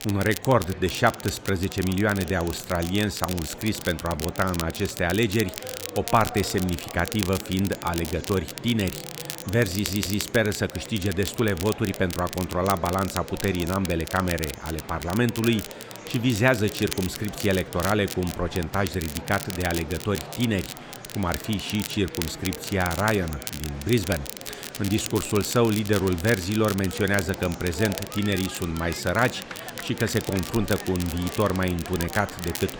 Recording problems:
murmuring crowd; noticeable; throughout; 15 dB below the speech
crackle, like an old record; noticeable; 10 dB below the speech
audio stuttering; at 9.5 s

